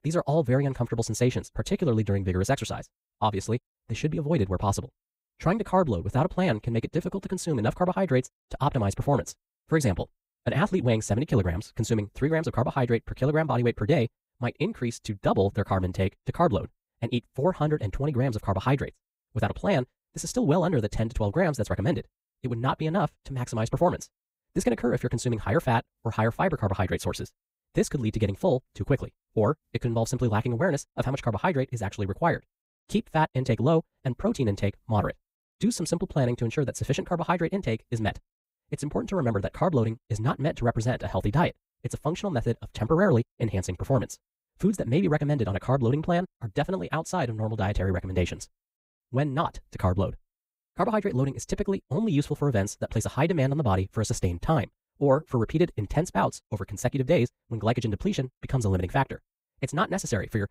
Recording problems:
wrong speed, natural pitch; too fast; 1.6 times normal speed

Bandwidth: 15.5 kHz